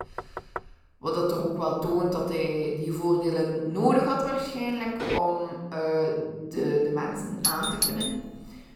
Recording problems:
off-mic speech; far
room echo; noticeable; dies away in 1.3 s
door banging; faint; at the start; peak 10 dB below the speech
footsteps; noticeable; at 5 s; peak 3 dB below the speech
doorbell; loud; at 7.5 s; peak 3 dB above the speech

